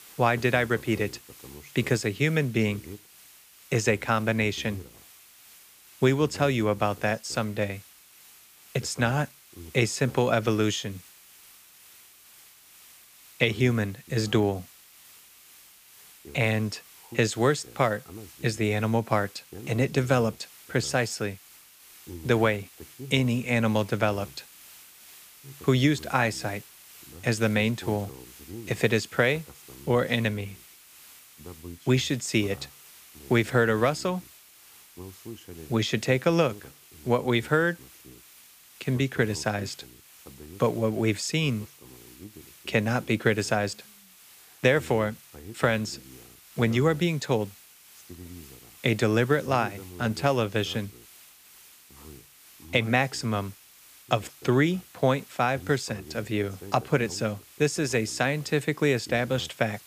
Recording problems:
hiss; faint; throughout; 25 dB below the speech

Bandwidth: 15 kHz